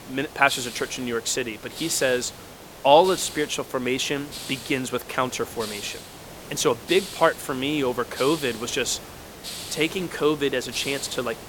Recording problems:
hiss; noticeable; throughout; 10 dB below the speech

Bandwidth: 17 kHz